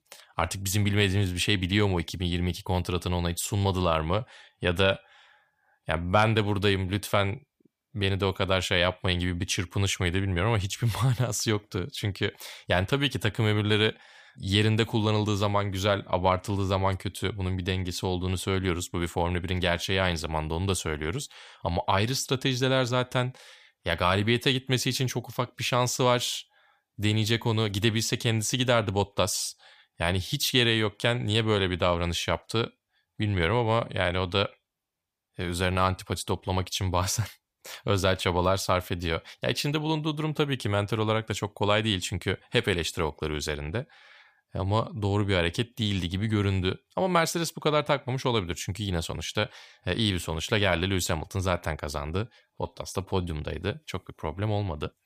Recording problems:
none

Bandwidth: 15 kHz